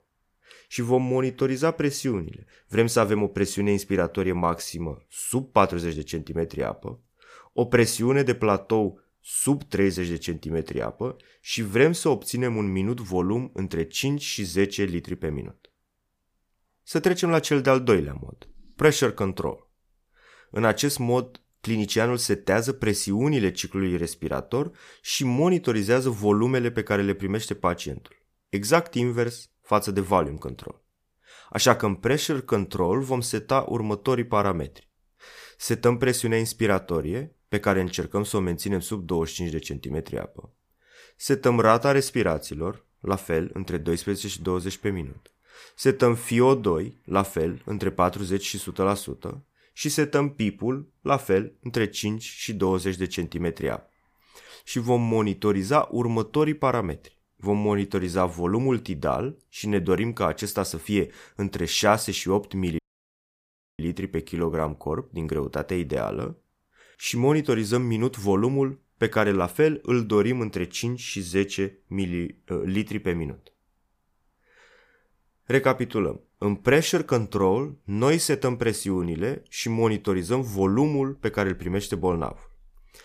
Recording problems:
audio cutting out; at 1:03 for 1 s

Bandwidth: 15 kHz